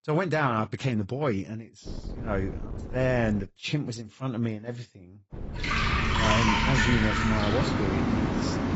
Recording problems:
garbled, watery; badly; nothing above 8 kHz
rain or running water; very loud; from 5.5 s on; 3 dB above the speech
wind noise on the microphone; occasional gusts; from 2 to 3.5 s and from 5.5 to 7 s; 15 dB below the speech

